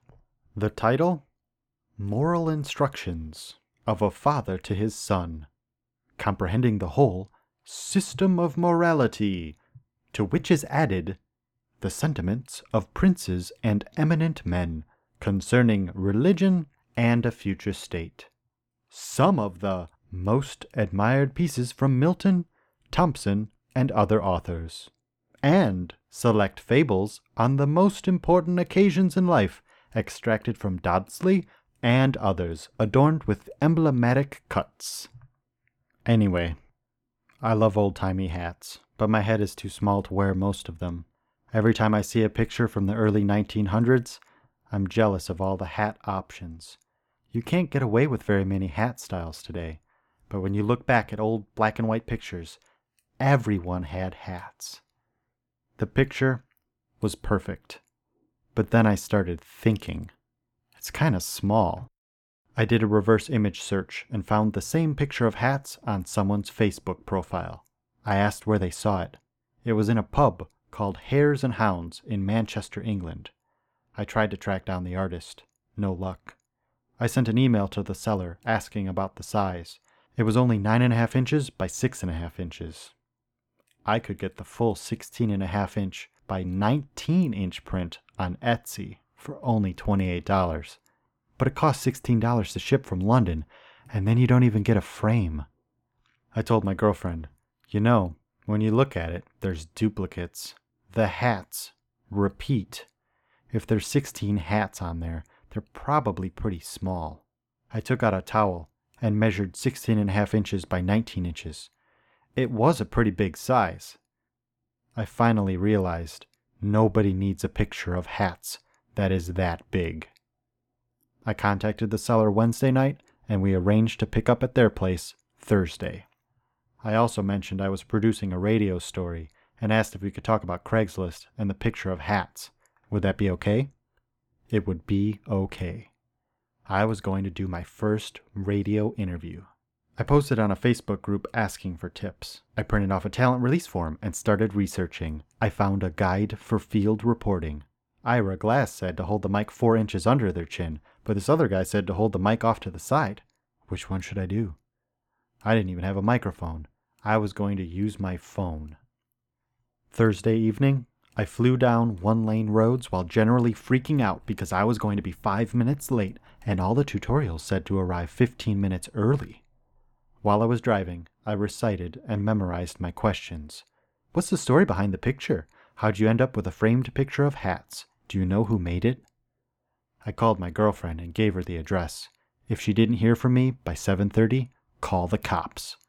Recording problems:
muffled; slightly; fading above 3 kHz

